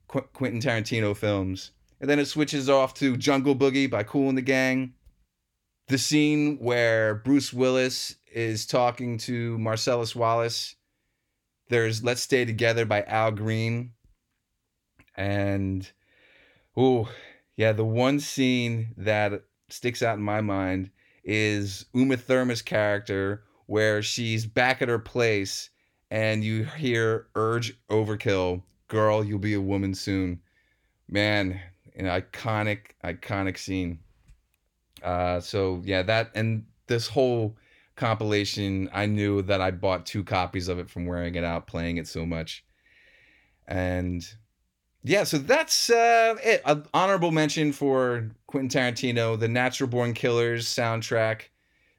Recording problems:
none

